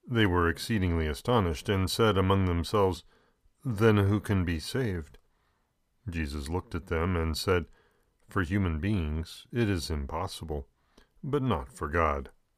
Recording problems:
none

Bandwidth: 15 kHz